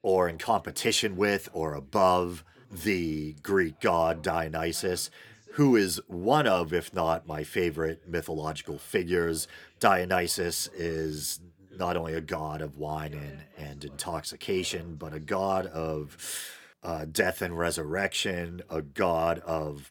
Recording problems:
voice in the background; faint; throughout; 30 dB below the speech

